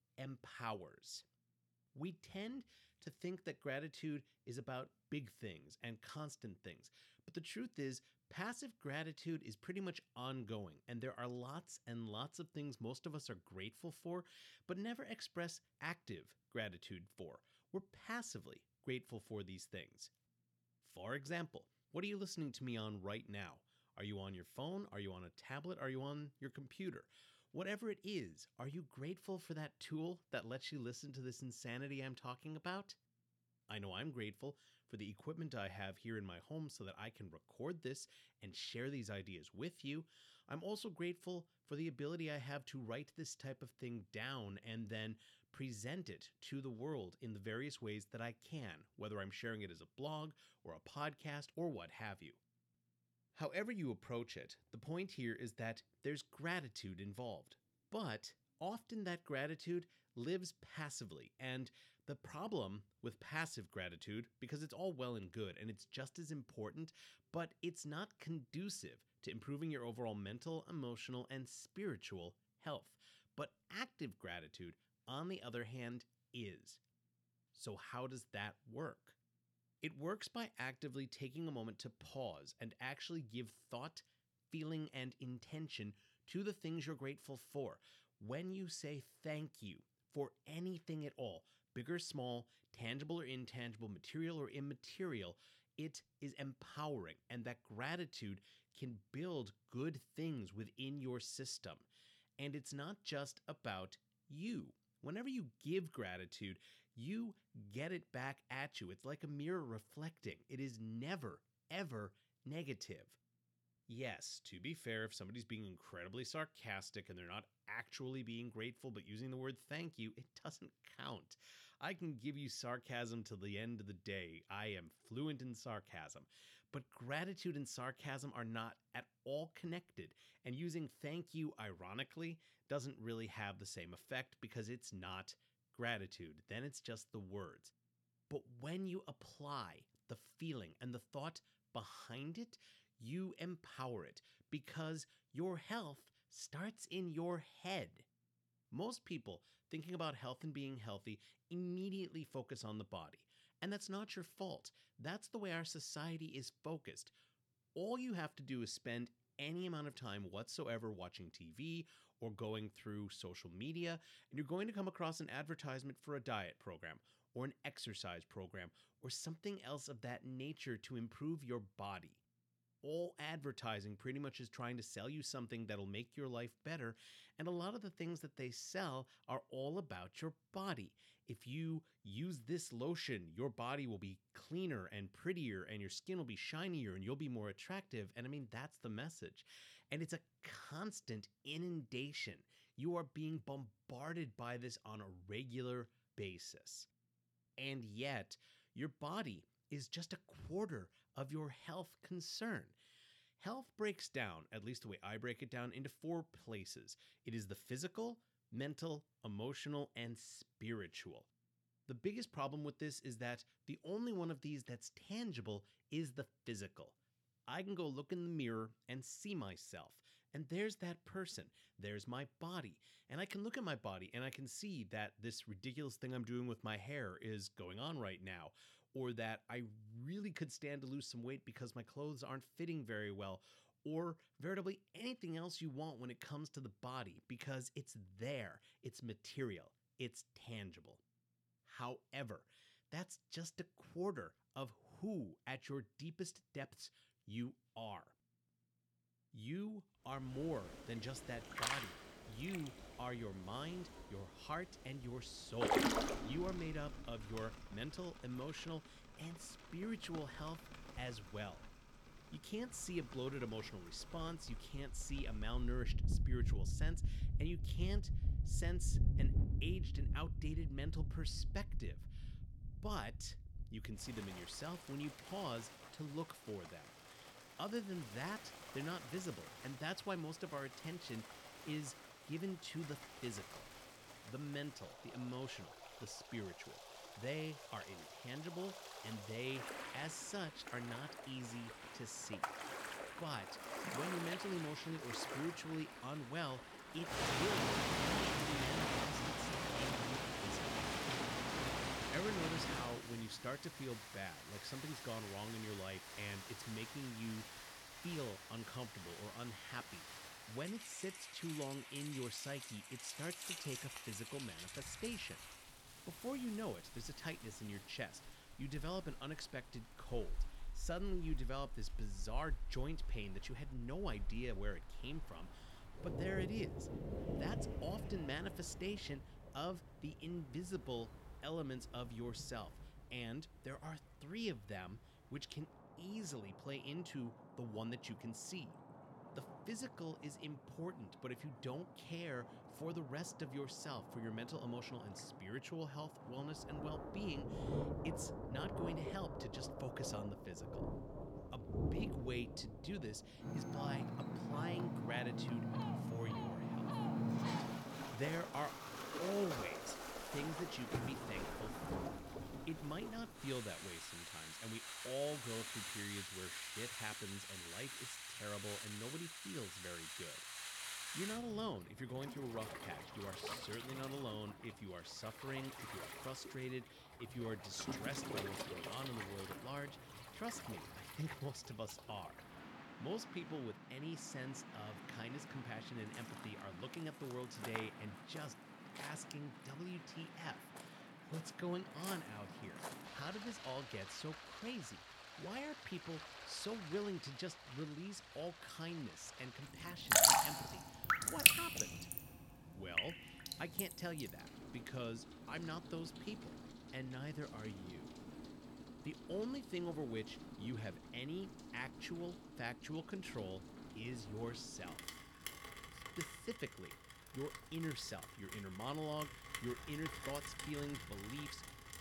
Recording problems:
rain or running water; very loud; from 4:10 on; 3 dB above the speech

